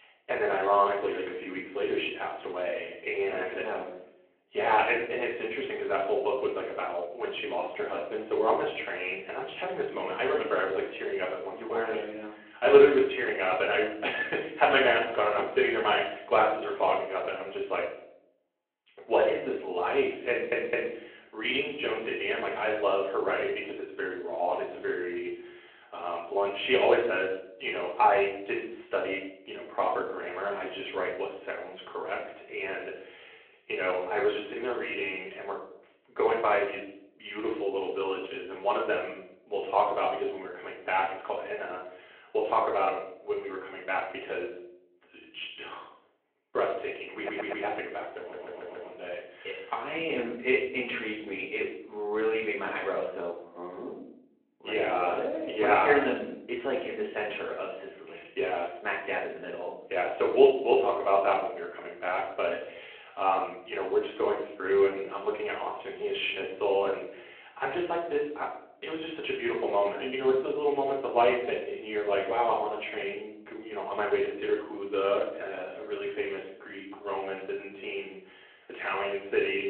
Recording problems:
off-mic speech; far
room echo; noticeable; dies away in 0.6 s
phone-call audio
audio stuttering; at 20 s, at 47 s and at 48 s

